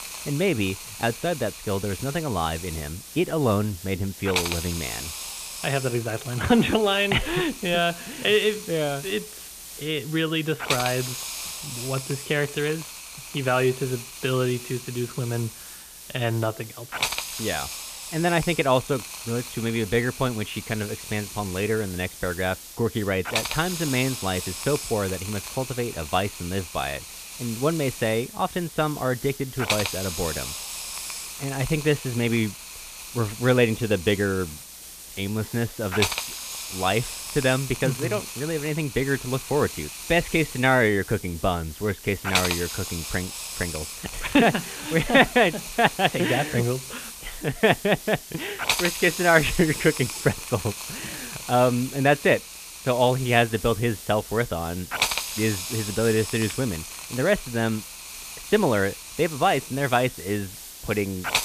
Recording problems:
high frequencies cut off; severe; nothing above 4 kHz
hiss; loud; throughout; 8 dB below the speech

